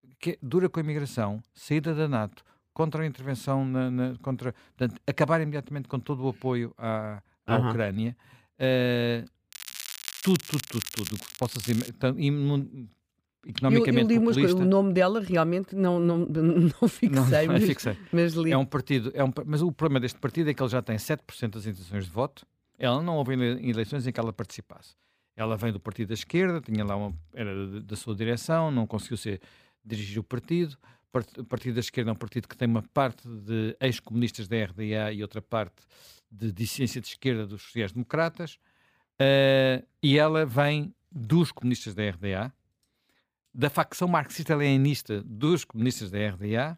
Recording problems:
crackling; loud; from 9.5 to 12 s; 9 dB below the speech

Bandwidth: 15 kHz